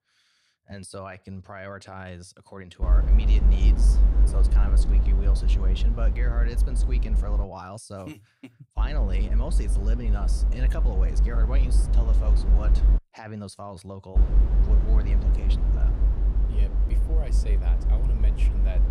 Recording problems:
low rumble; loud; from 3 to 7.5 s, from 9 to 13 s and from 14 s on; 3 dB below the speech

